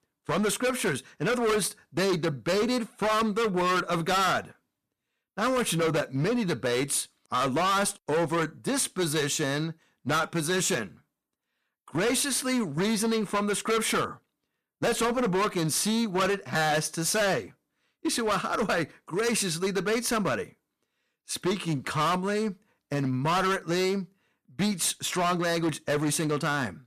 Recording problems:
distortion; heavy; 18% of the sound clipped

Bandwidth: 14.5 kHz